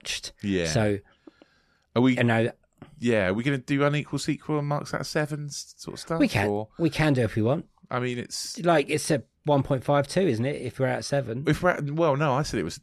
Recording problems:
none

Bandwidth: 13.5 kHz